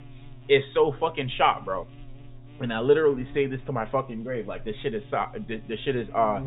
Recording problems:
high frequencies cut off; severe; nothing above 4 kHz
electrical hum; faint; throughout; 60 Hz, 25 dB below the speech

